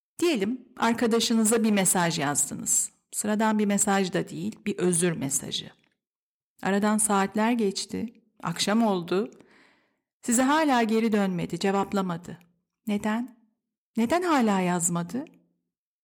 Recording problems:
none

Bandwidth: 18.5 kHz